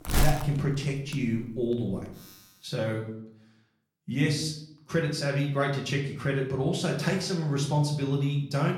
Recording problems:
off-mic speech; far
room echo; slight; dies away in 0.5 s
household noises; loud; until 2 s; 7 dB below the speech

